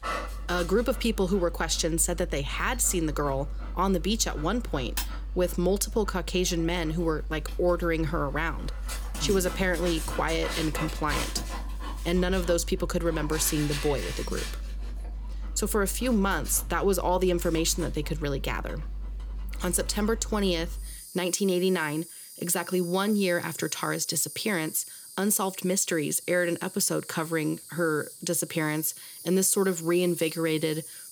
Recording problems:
animal sounds; loud; throughout; 10 dB below the speech

